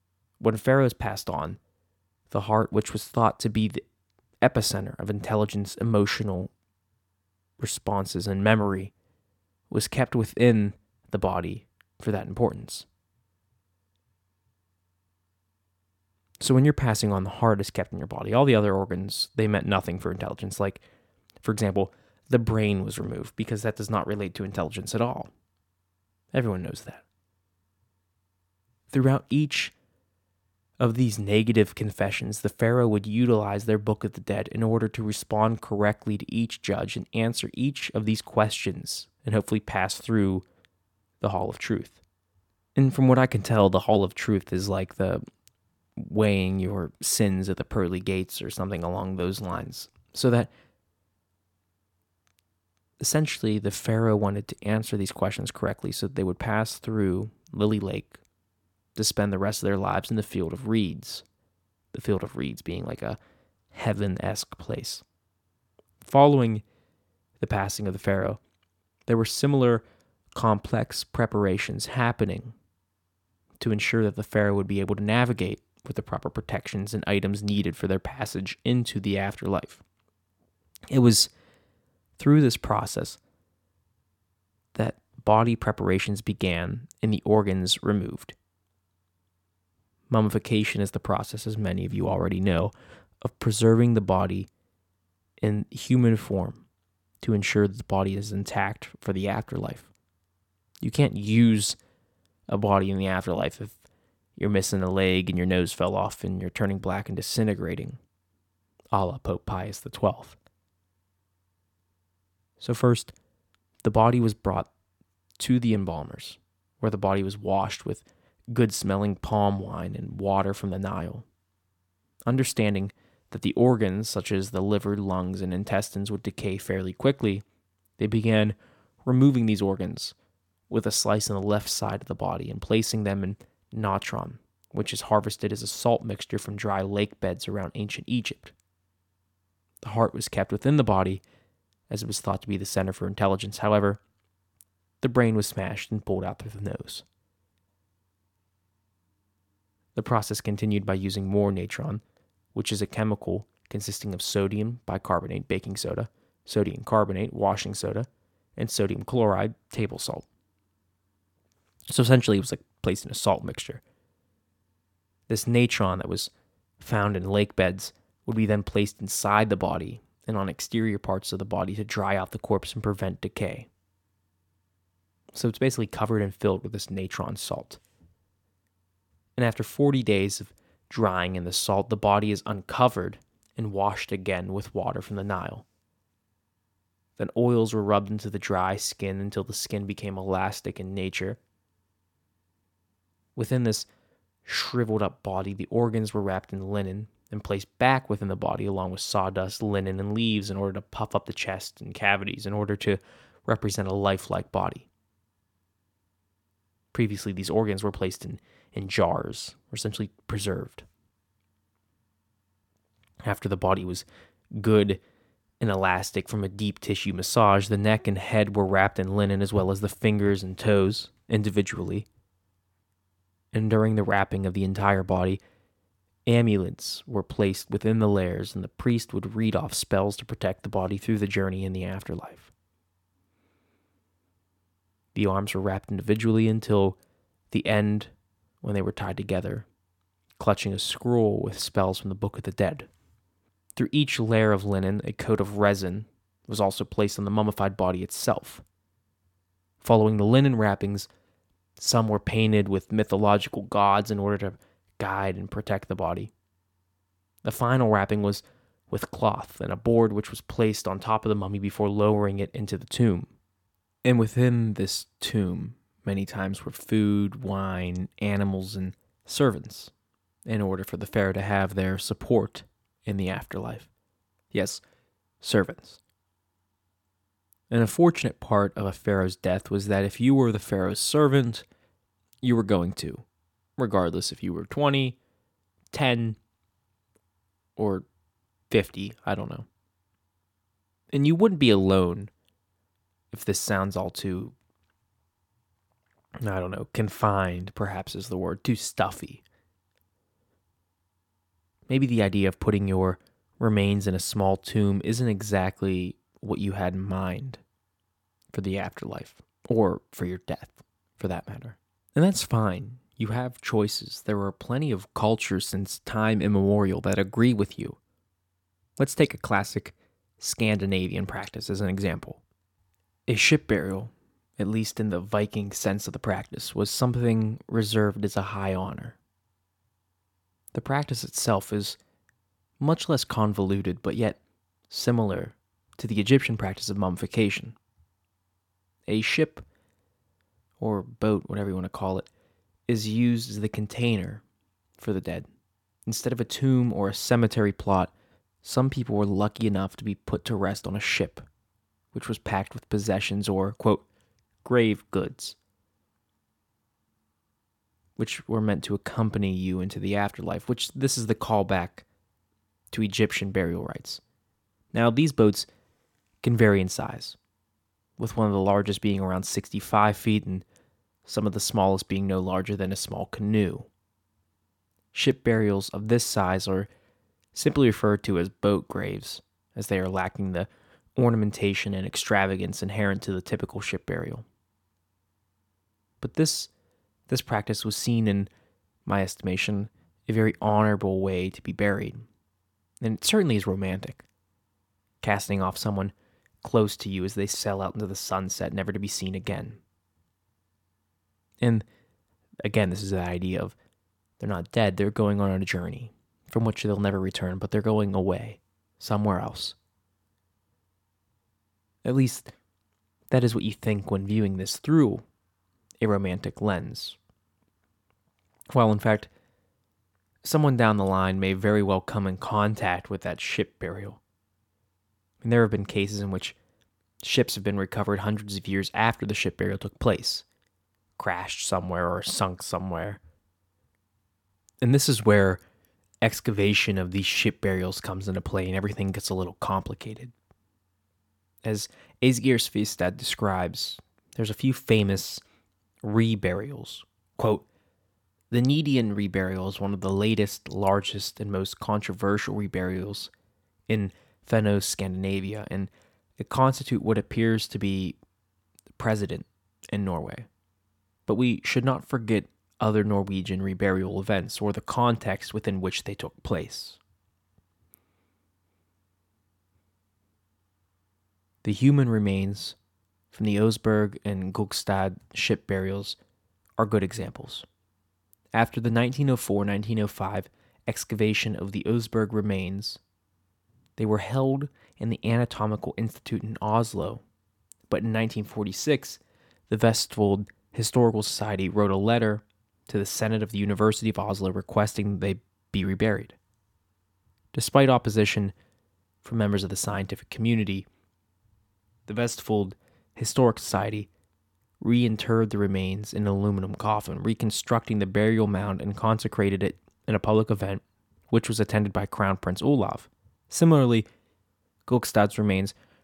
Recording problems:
none

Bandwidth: 17.5 kHz